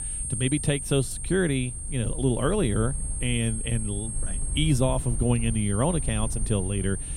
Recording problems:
high-pitched whine; loud; throughout; 8.5 kHz, 6 dB below the speech
low rumble; faint; throughout; 20 dB below the speech

